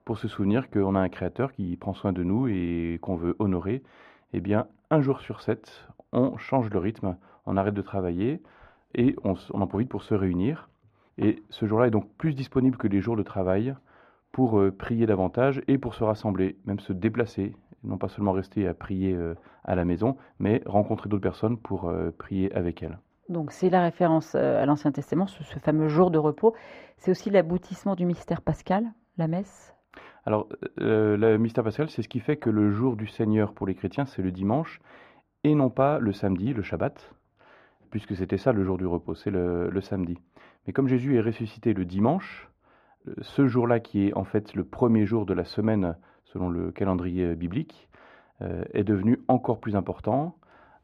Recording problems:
muffled; very; fading above 4 kHz

